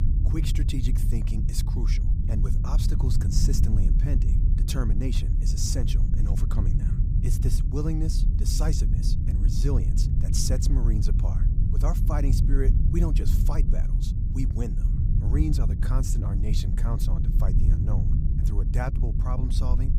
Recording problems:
low rumble; loud; throughout; 3 dB below the speech

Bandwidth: 15.5 kHz